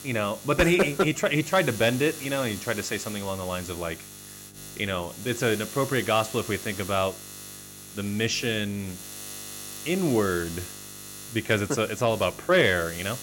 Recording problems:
electrical hum; noticeable; throughout; 50 Hz, 15 dB below the speech

